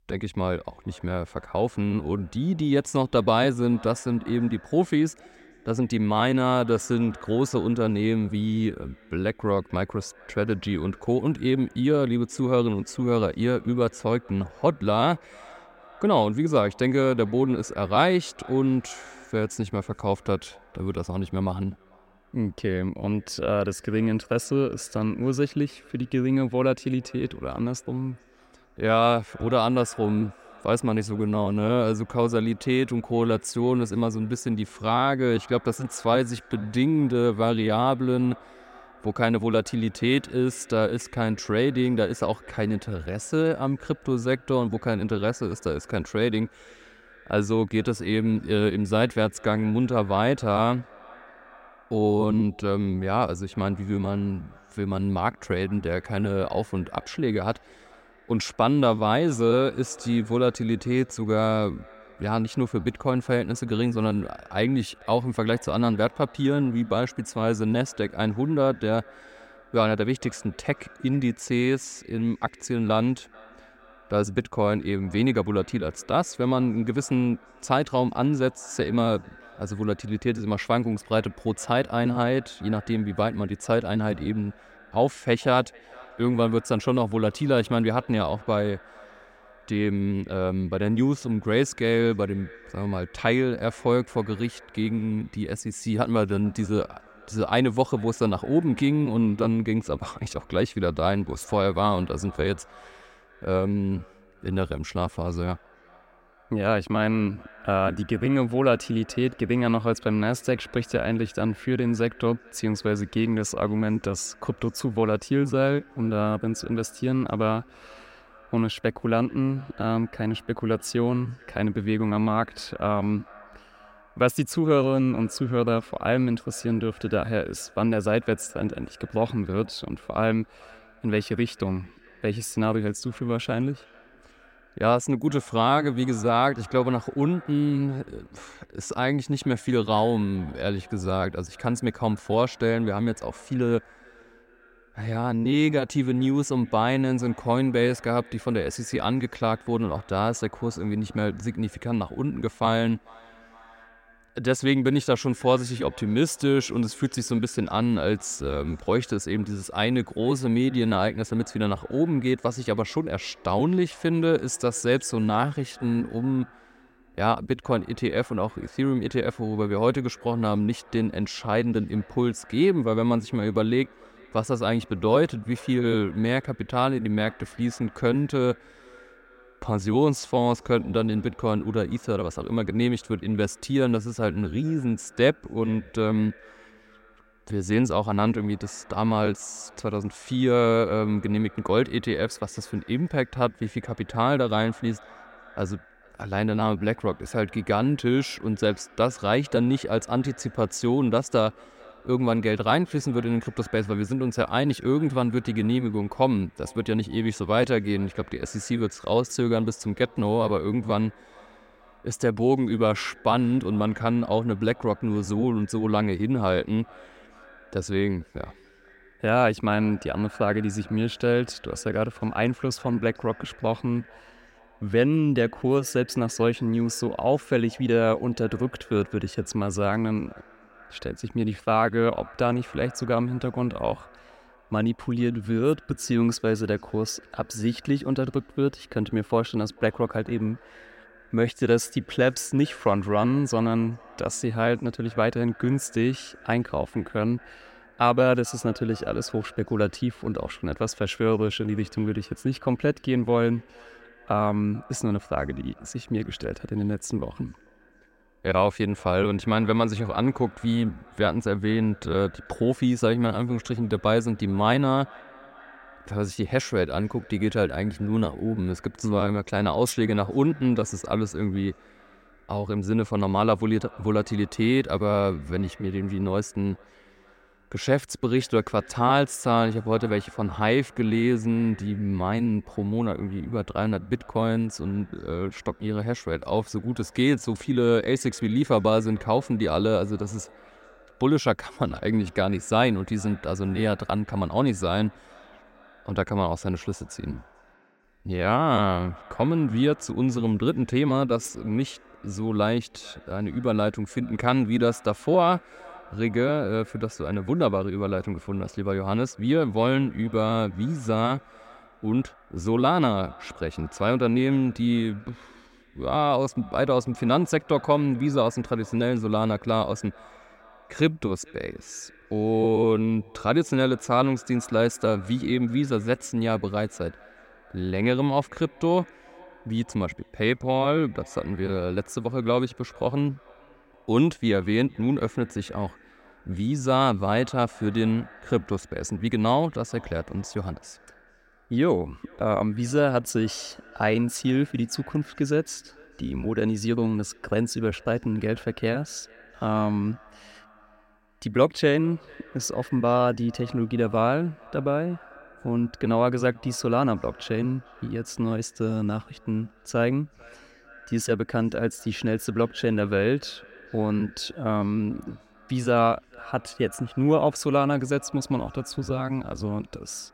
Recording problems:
echo of what is said; faint; throughout; 440 ms later, 25 dB below the speech

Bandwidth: 16 kHz